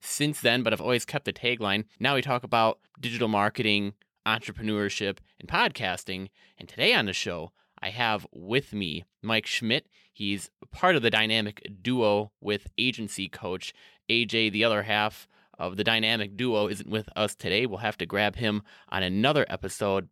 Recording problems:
none

